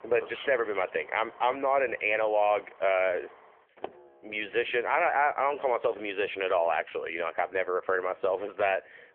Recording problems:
phone-call audio; nothing above 3.5 kHz
traffic noise; faint; throughout; 25 dB below the speech

